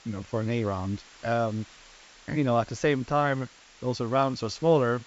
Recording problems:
high frequencies cut off; noticeable; nothing above 8 kHz
hiss; faint; throughout; 25 dB below the speech

